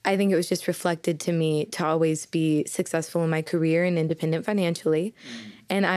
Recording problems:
abrupt cut into speech; at the end

